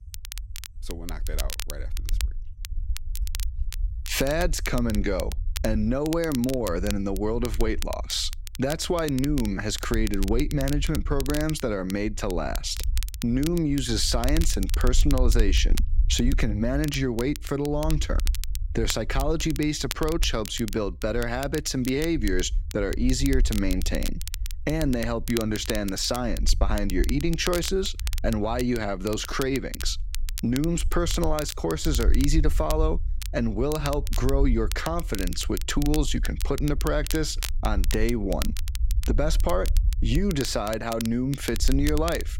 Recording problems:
crackle, like an old record; noticeable; 10 dB below the speech
low rumble; faint; throughout; 25 dB below the speech

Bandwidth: 16 kHz